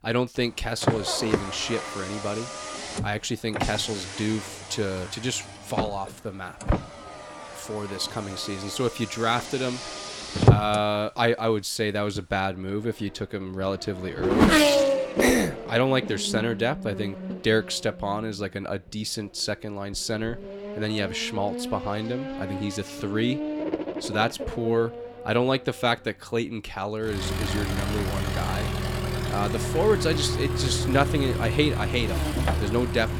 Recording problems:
traffic noise; loud; throughout; 1 dB below the speech

